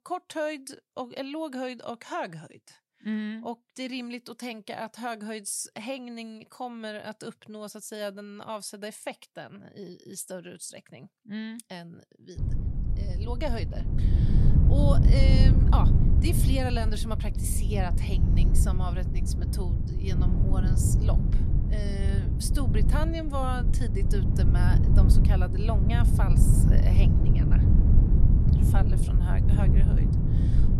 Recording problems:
wind noise on the microphone; heavy; from 12 s on; 2 dB below the speech

